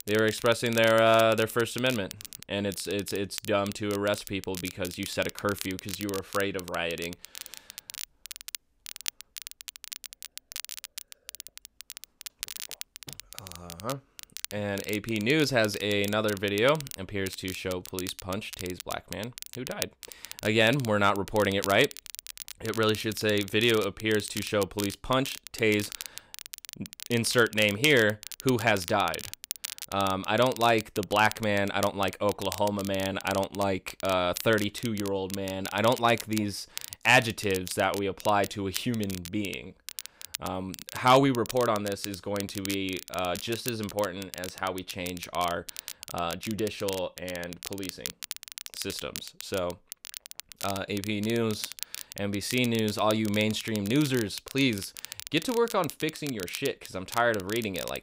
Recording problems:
crackle, like an old record; noticeable; 10 dB below the speech

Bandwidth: 15.5 kHz